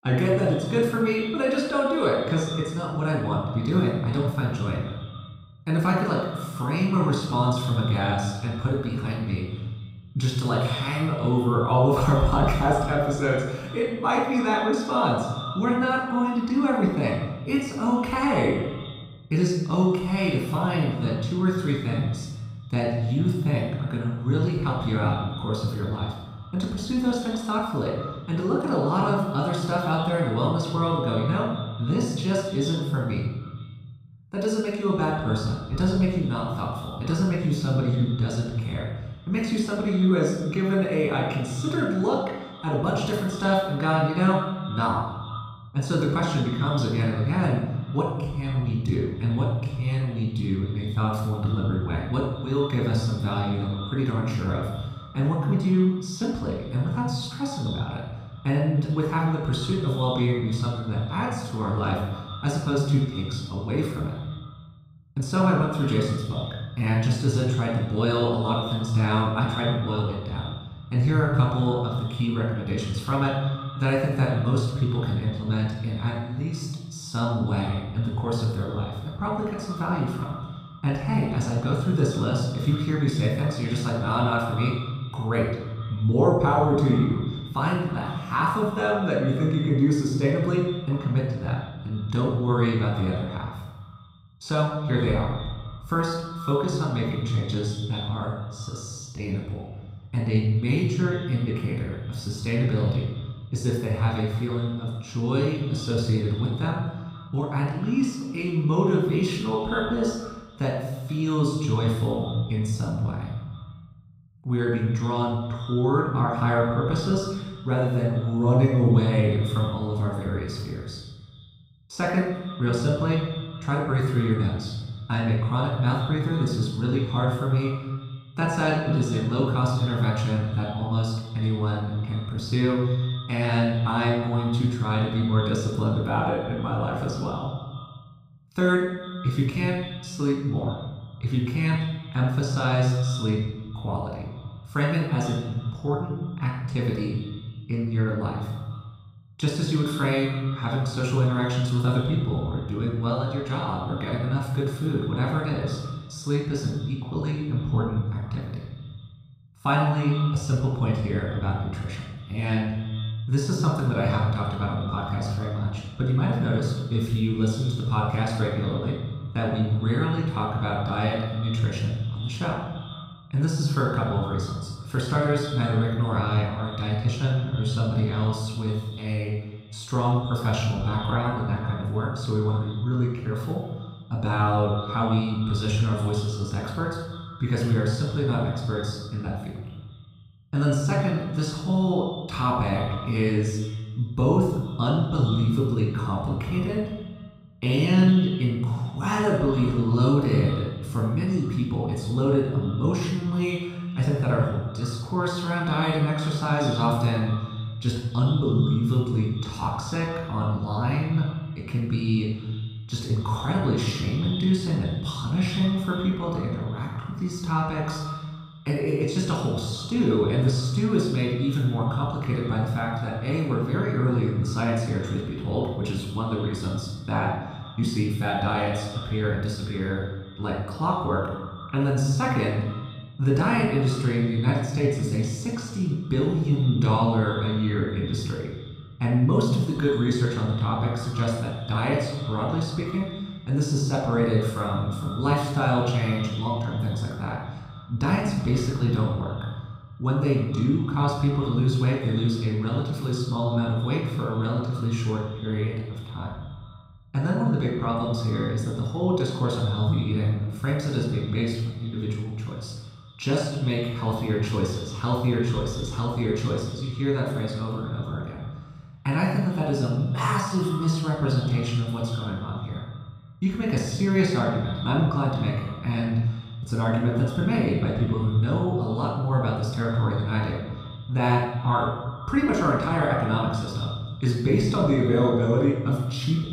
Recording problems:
echo of what is said; noticeable; throughout; 150 ms later, 20 dB below the speech
room echo; noticeable; dies away in 1 s
off-mic speech; somewhat distant

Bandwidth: 15.5 kHz